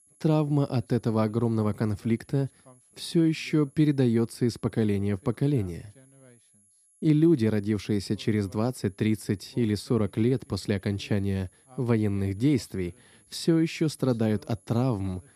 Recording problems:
high-pitched whine; faint; throughout; 11 kHz, 30 dB below the speech

